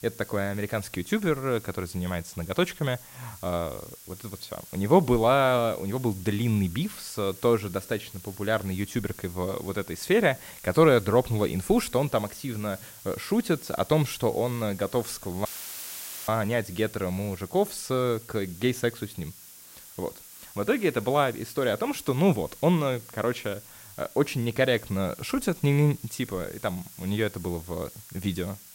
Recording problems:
hiss; noticeable; throughout; 15 dB below the speech
audio cutting out; filled with static; at 15 s for 1 s

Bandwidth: 16 kHz